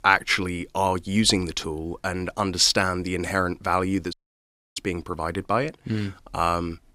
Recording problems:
audio cutting out; at 4 s for 0.5 s

